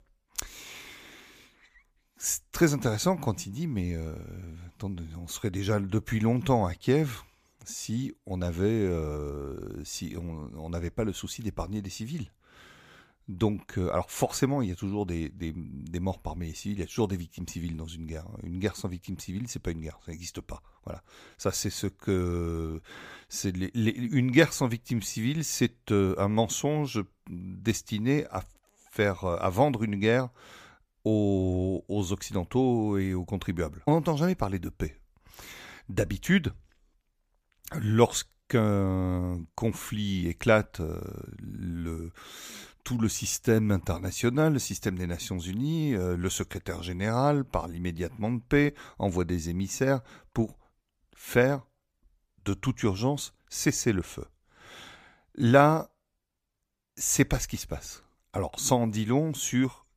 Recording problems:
none

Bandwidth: 15 kHz